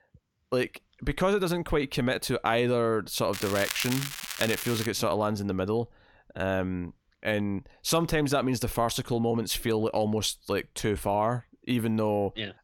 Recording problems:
crackling; loud; from 3.5 to 5 s; 6 dB below the speech

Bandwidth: 17 kHz